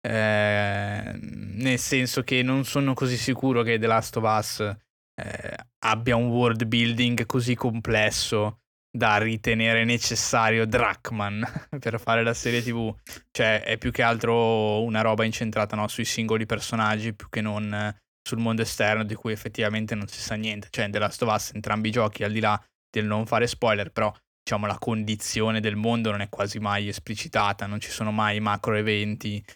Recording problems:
none

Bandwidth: 18.5 kHz